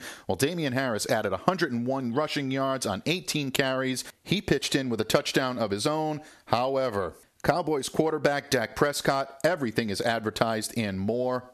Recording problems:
squashed, flat; somewhat

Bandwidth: 13.5 kHz